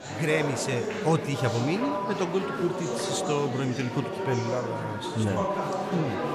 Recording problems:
murmuring crowd; loud; throughout; 2 dB below the speech

